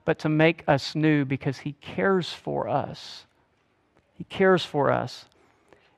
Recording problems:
muffled; slightly; fading above 2.5 kHz

